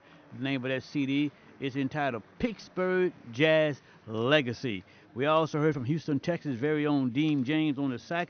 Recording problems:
high frequencies cut off; noticeable; nothing above 6 kHz
chatter from many people; faint; throughout; 30 dB below the speech

